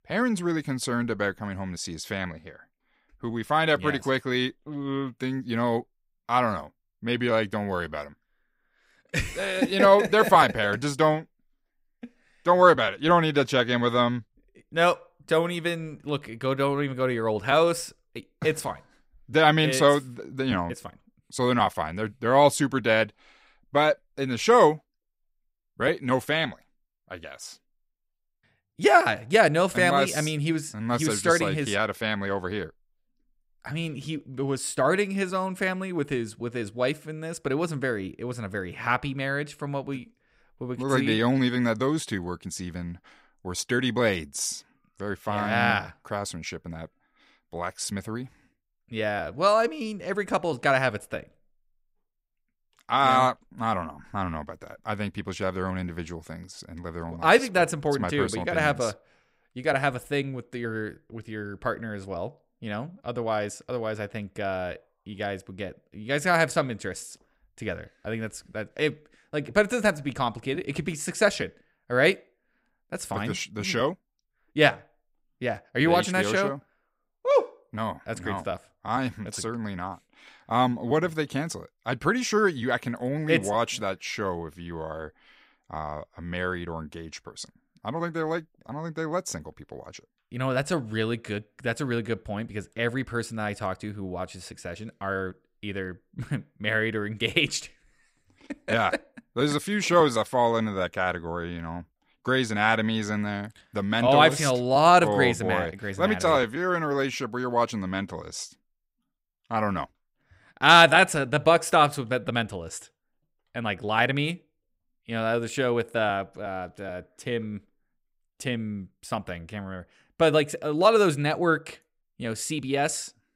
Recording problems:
none

